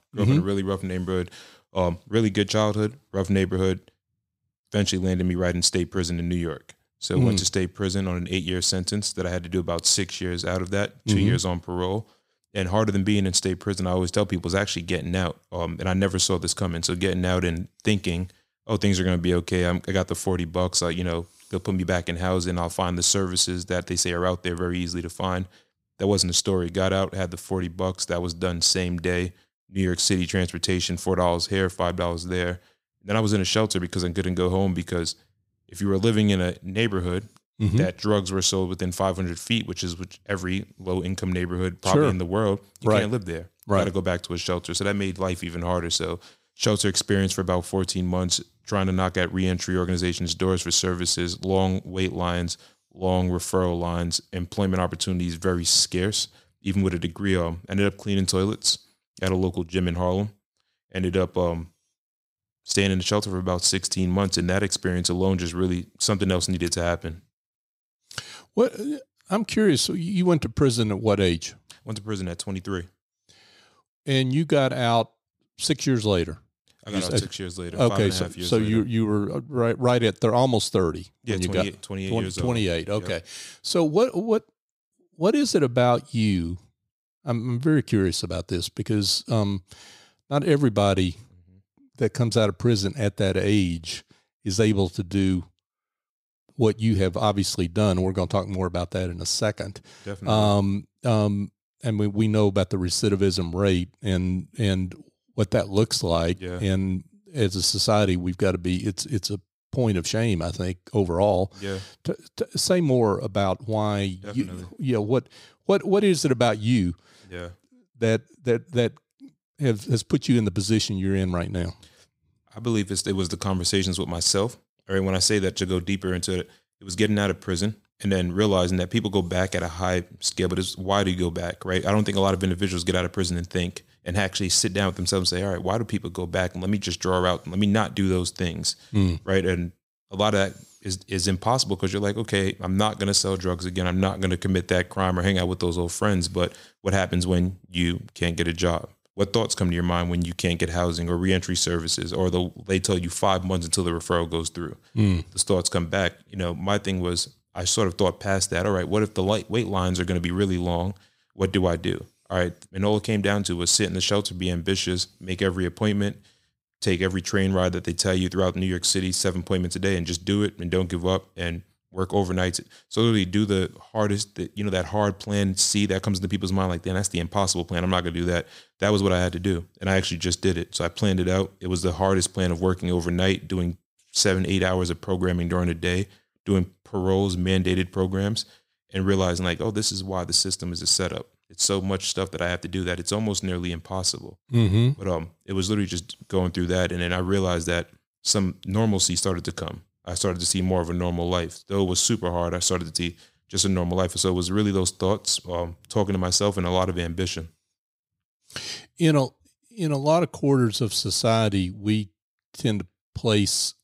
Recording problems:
none

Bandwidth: 15.5 kHz